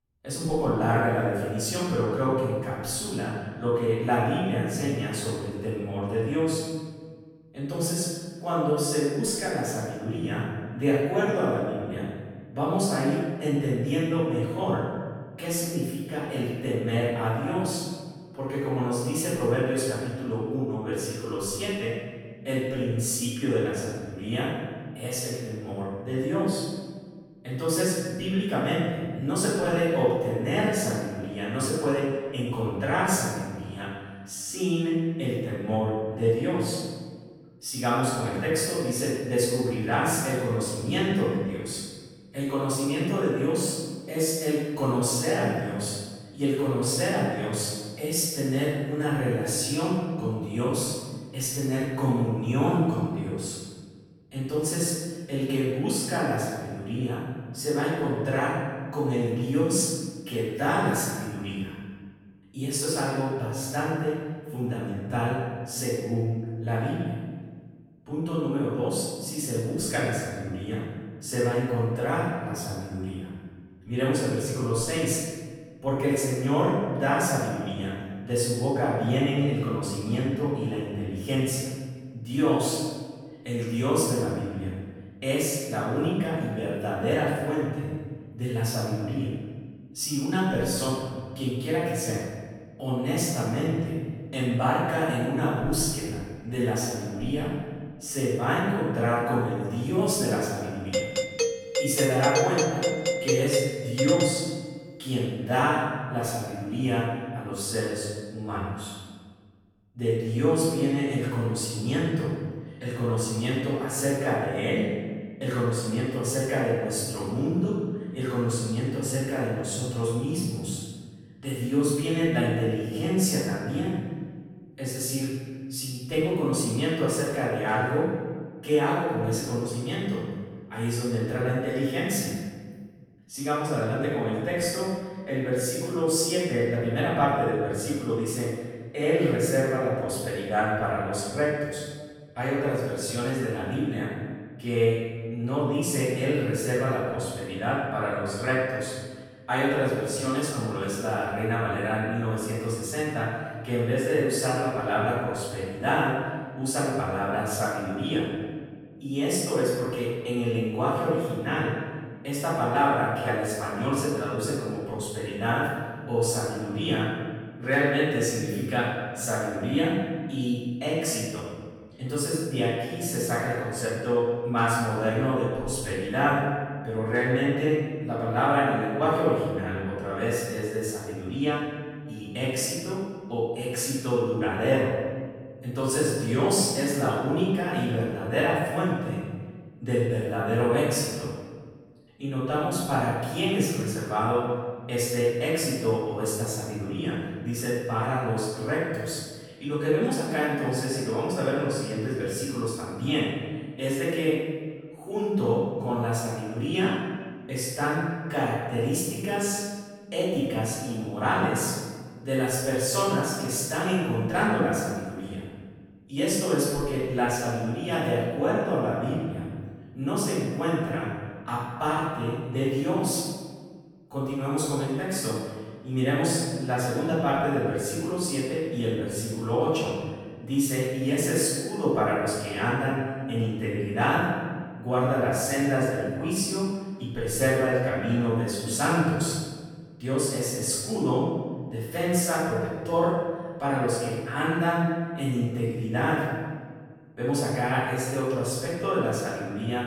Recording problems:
room echo; strong; dies away in 1.4 s
off-mic speech; far
doorbell; loud; from 1:41 to 1:45; peak 2 dB above the speech

